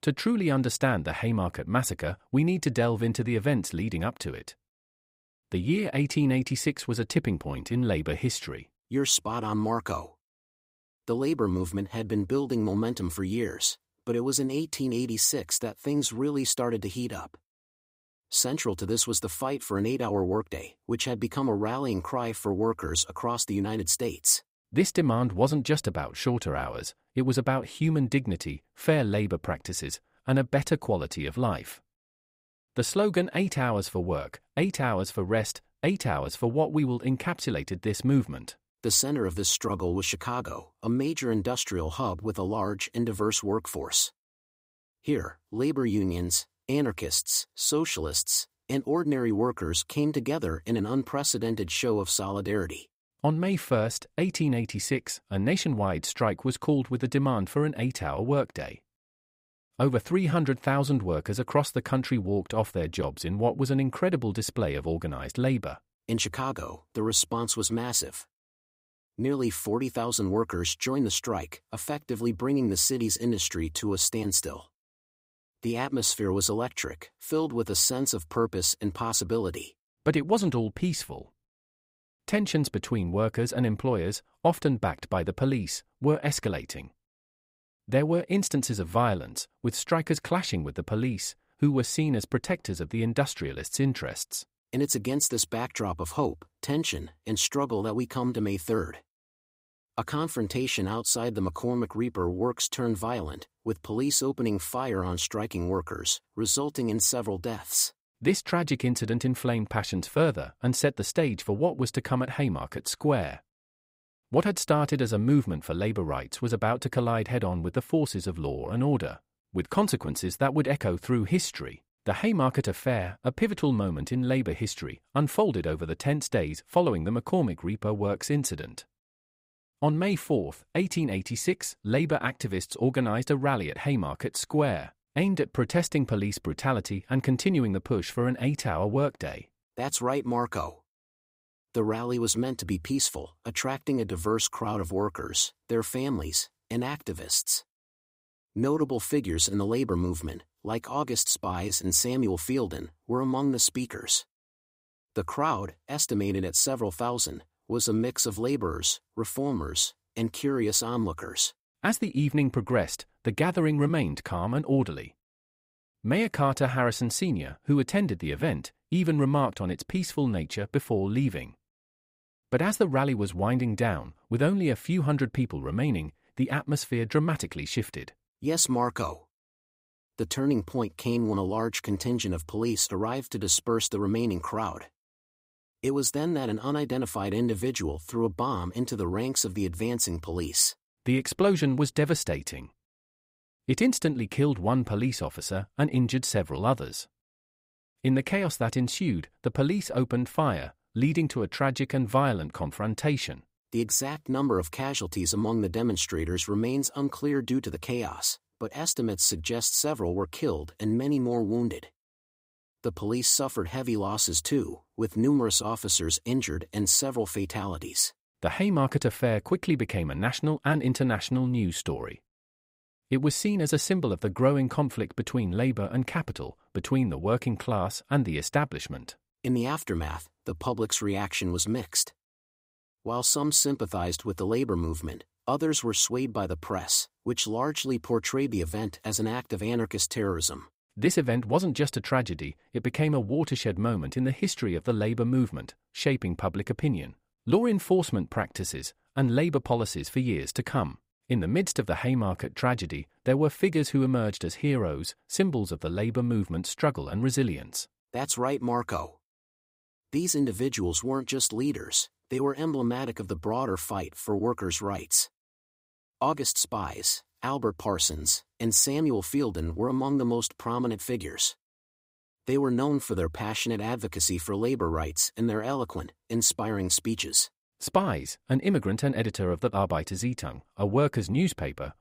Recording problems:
none

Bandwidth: 15.5 kHz